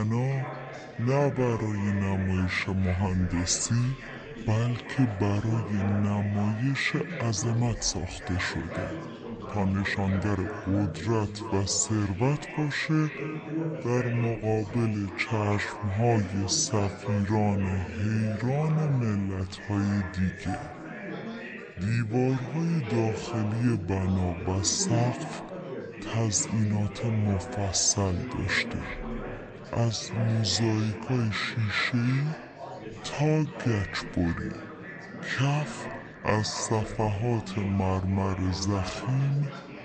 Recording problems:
wrong speed and pitch; too slow and too low; 0.6 times normal speed
echo of what is said; faint; throughout; 320 ms later, 20 dB below the speech
chatter from many people; noticeable; throughout; 10 dB below the speech
abrupt cut into speech; at the start
uneven, jittery; strongly; from 0.5 to 37 s

